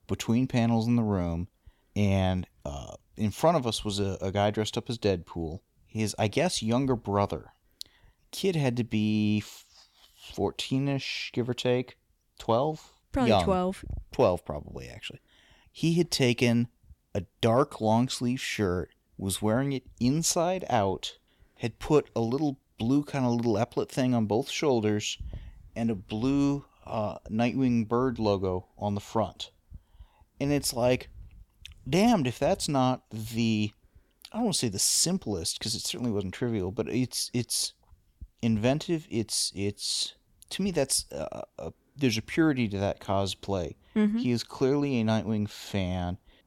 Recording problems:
none

